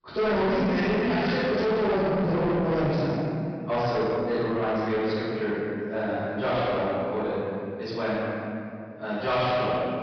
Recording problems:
distortion; heavy; 7 dB below the speech
room echo; strong; dies away in 2.2 s
off-mic speech; far
high frequencies cut off; noticeable; nothing above 5.5 kHz

